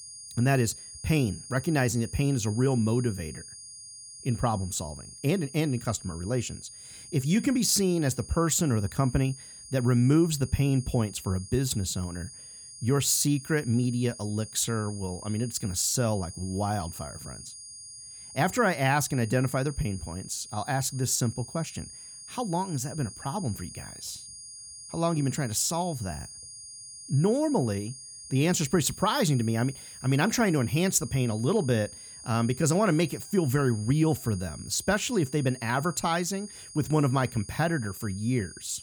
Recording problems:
high-pitched whine; noticeable; throughout; 9.5 kHz, 15 dB below the speech

